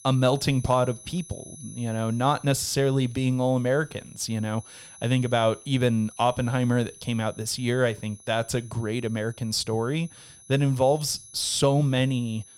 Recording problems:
high-pitched whine; faint; throughout; 11 kHz, 20 dB below the speech

